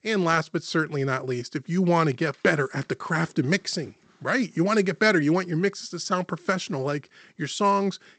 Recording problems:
garbled, watery; slightly; nothing above 8 kHz

